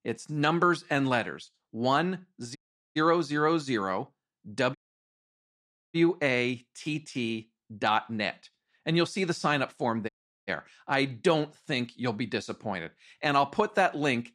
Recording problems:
audio cutting out; at 2.5 s, at 5 s for 1 s and at 10 s

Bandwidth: 13.5 kHz